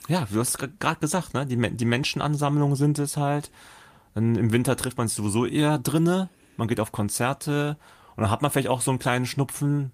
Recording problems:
none

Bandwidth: 15 kHz